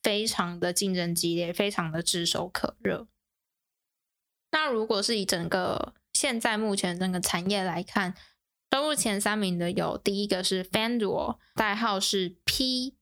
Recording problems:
squashed, flat; somewhat

